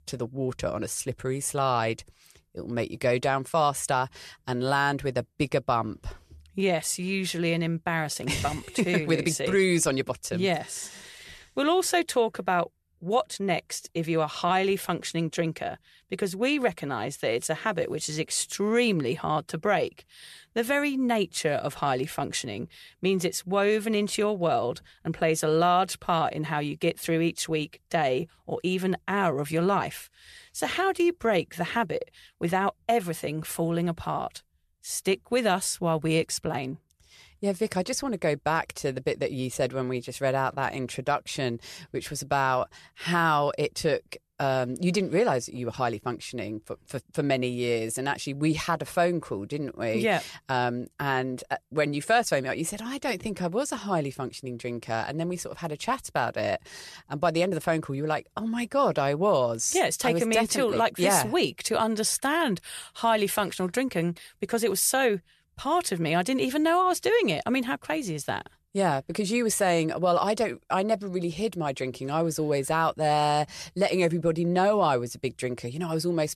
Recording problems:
none

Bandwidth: 13.5 kHz